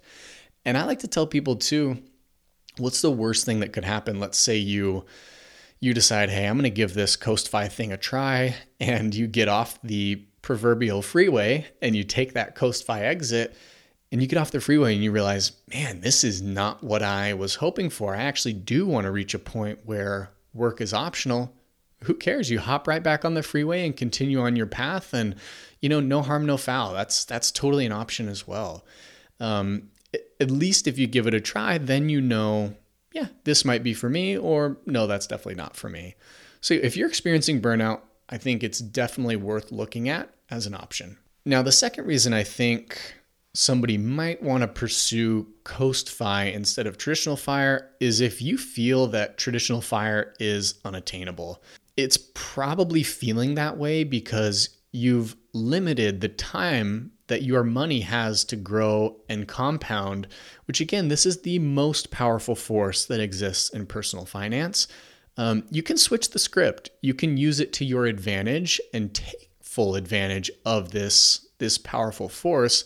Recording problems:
none

